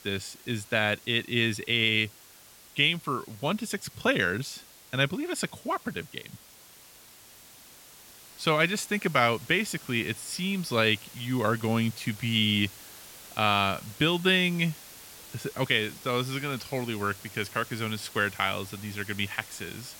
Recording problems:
hiss; noticeable; throughout; 20 dB below the speech

